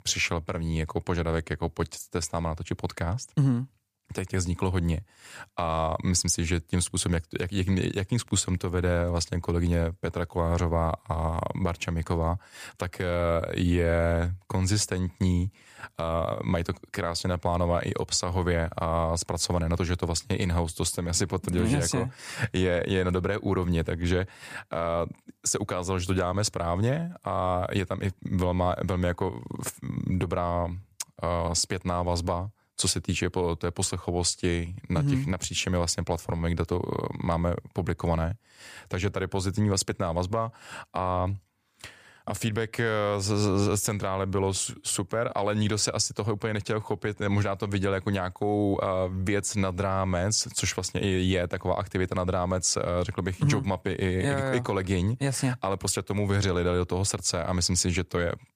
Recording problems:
none

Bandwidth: 15 kHz